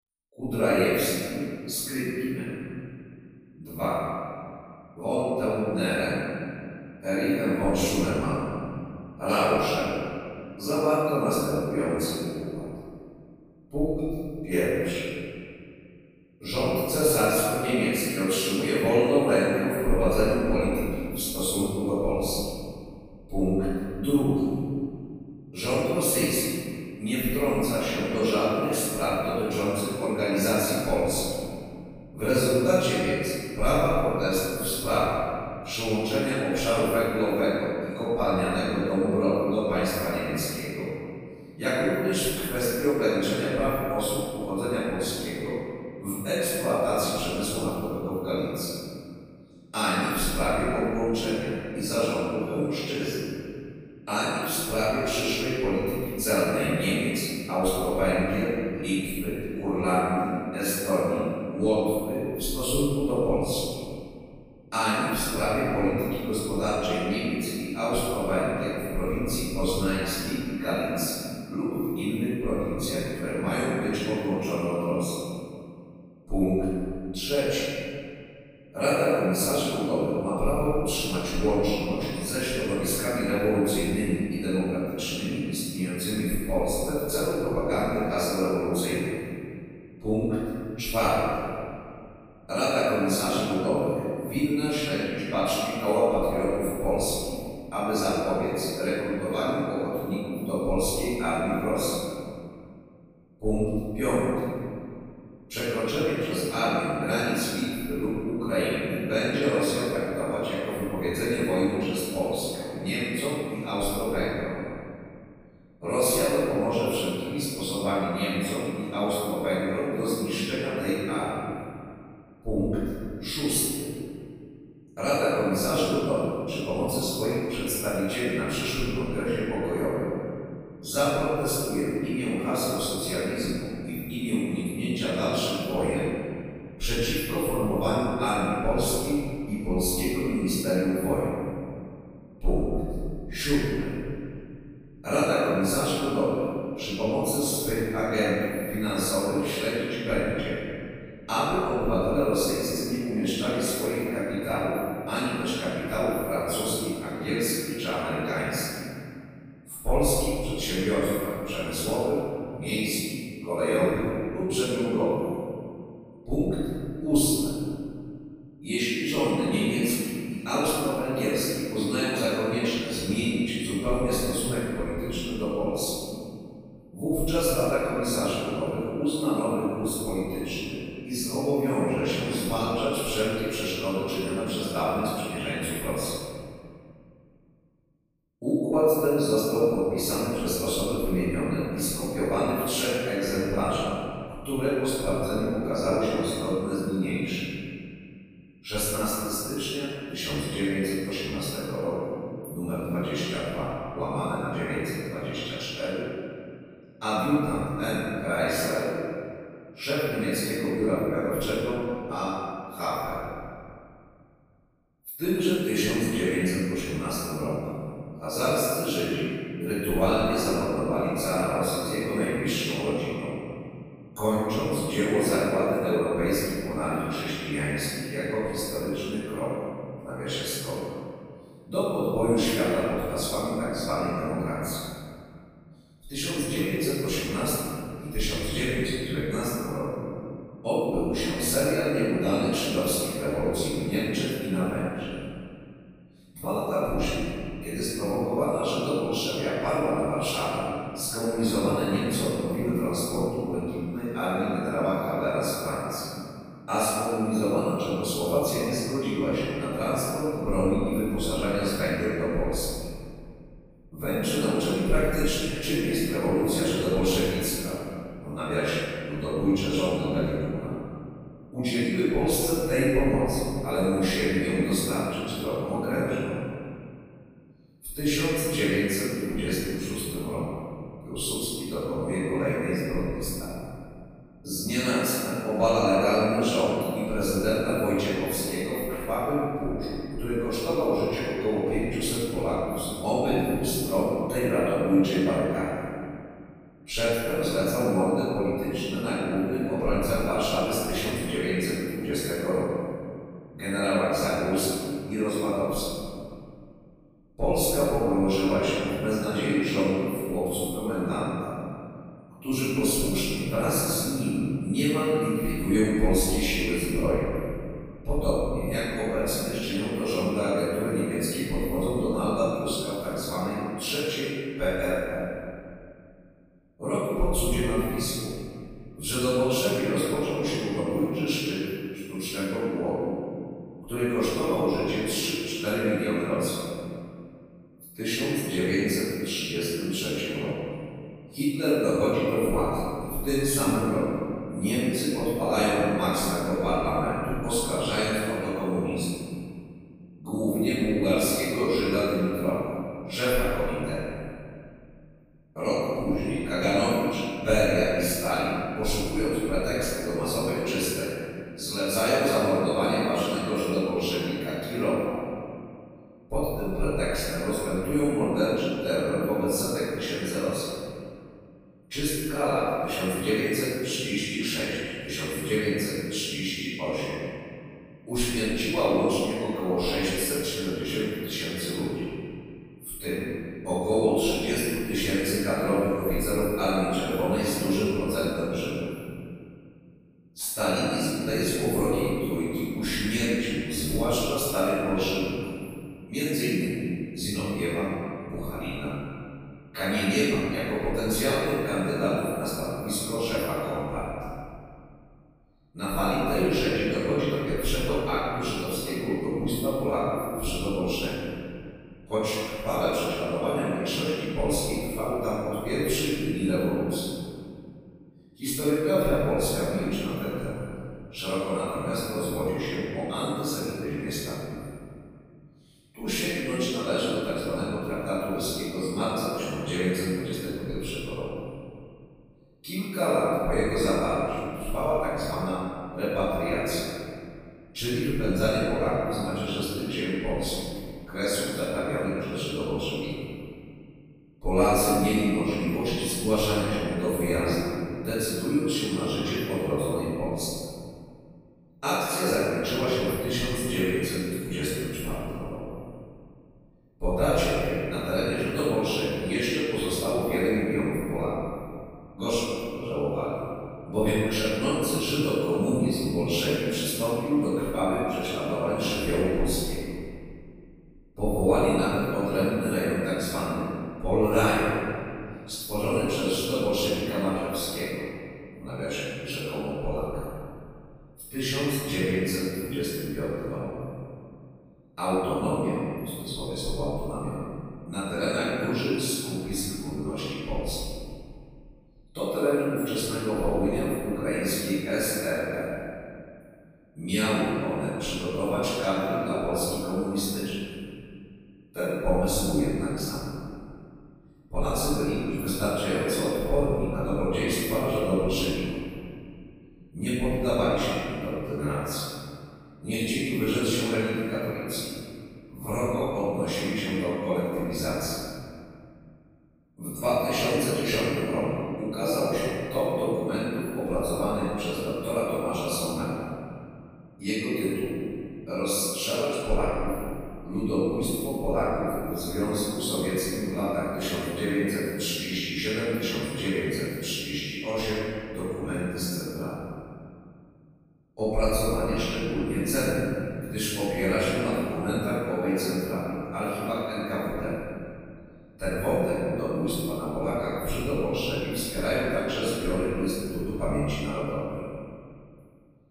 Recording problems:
room echo; strong; dies away in 2.2 s
off-mic speech; far

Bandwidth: 15 kHz